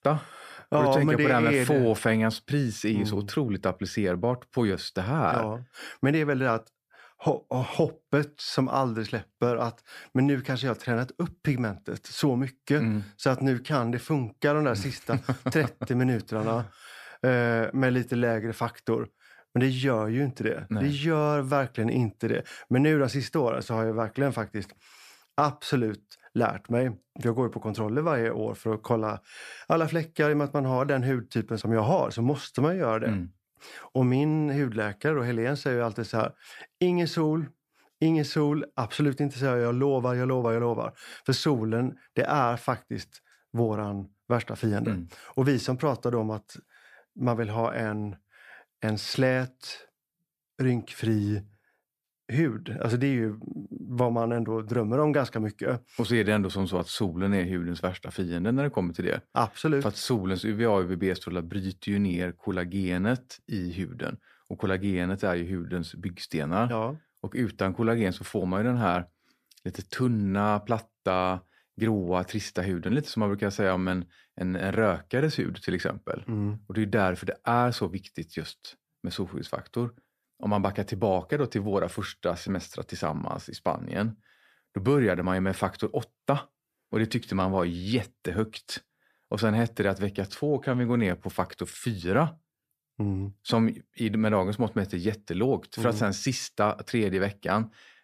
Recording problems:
none

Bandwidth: 14.5 kHz